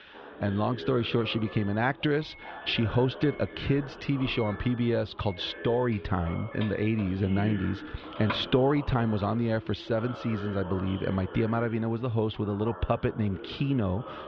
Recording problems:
muffled; very; fading above 3.5 kHz
background chatter; noticeable; throughout; 2 voices, 15 dB below the speech
doorbell; noticeable; from 4.5 to 8.5 s; peak 7 dB below the speech

